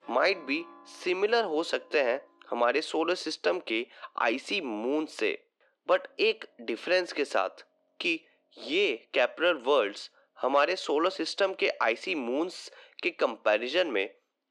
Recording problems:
muffled; slightly; fading above 2.5 kHz
thin; somewhat; fading below 300 Hz
background music; faint; throughout; 25 dB below the speech

